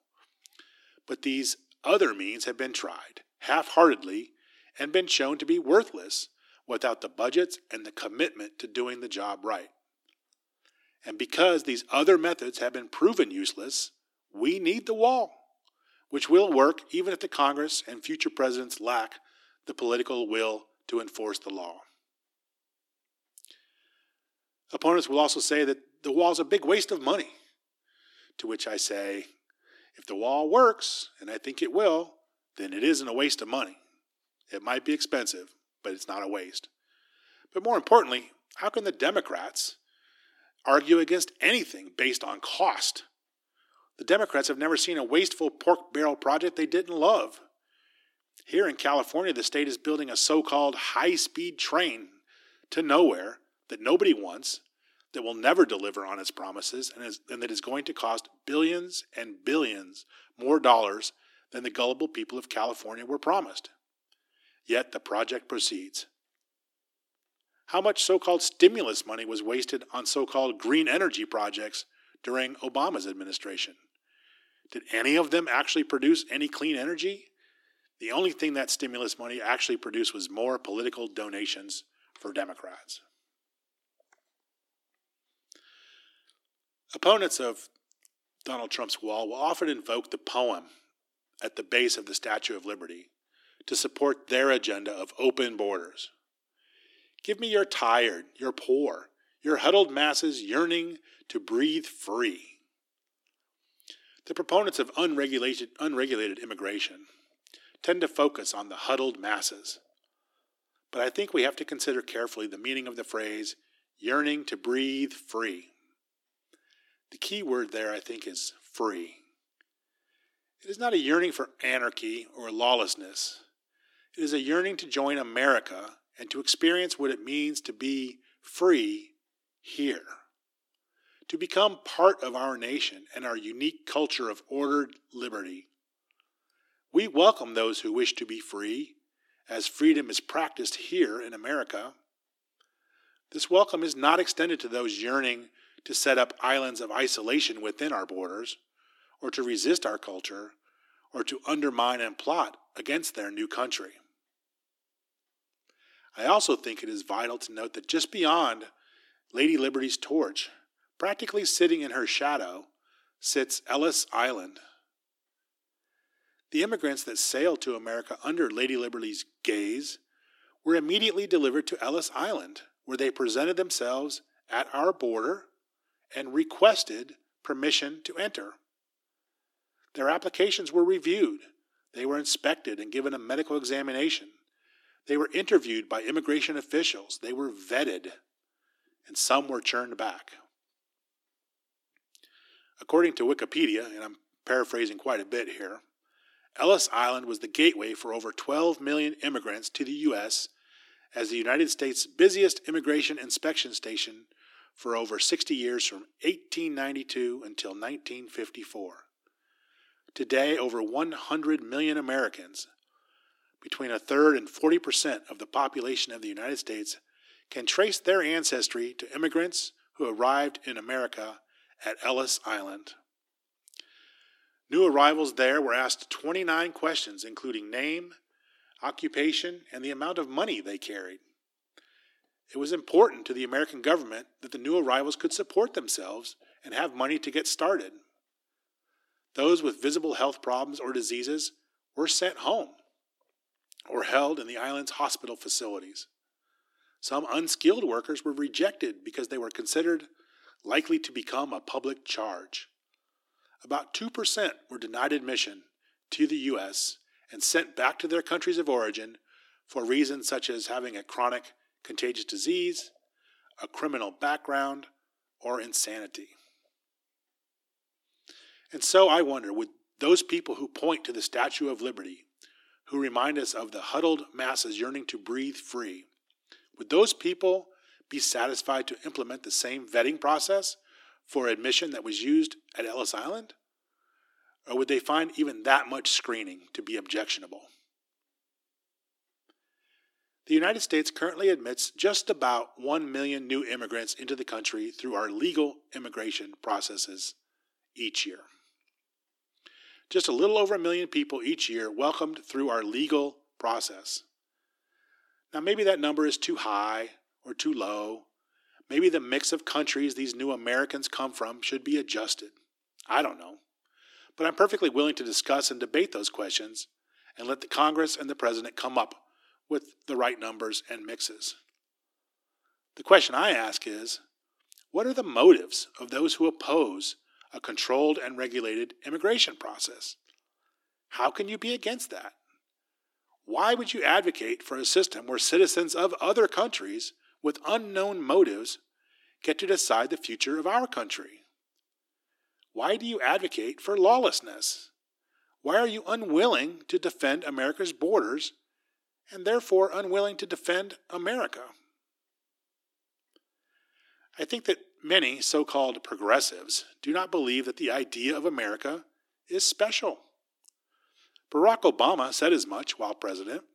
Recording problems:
thin; somewhat; fading below 300 Hz

